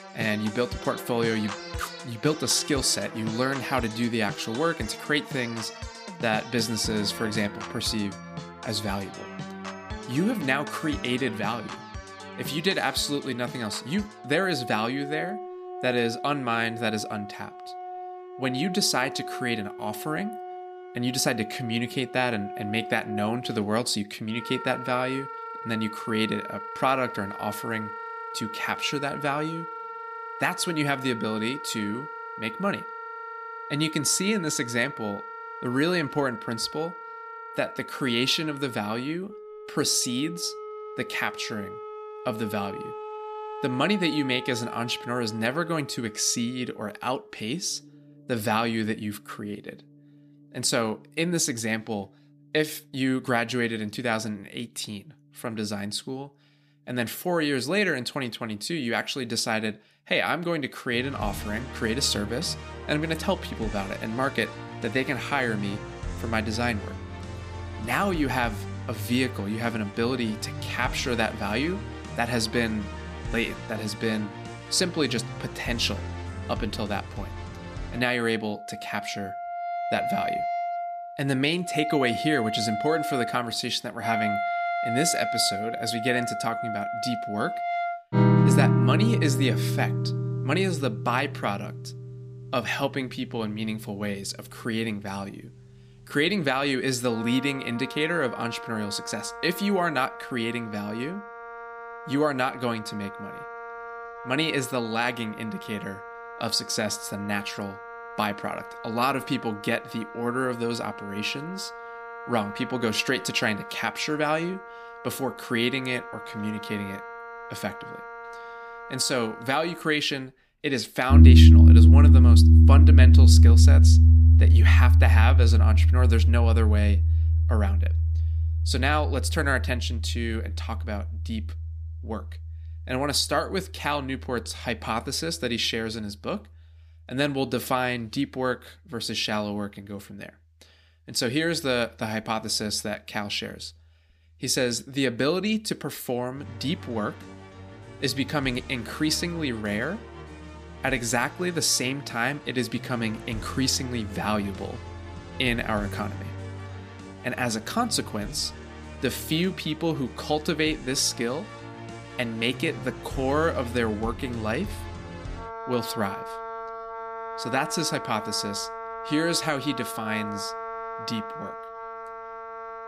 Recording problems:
background music; very loud; throughout; 2 dB above the speech

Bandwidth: 15 kHz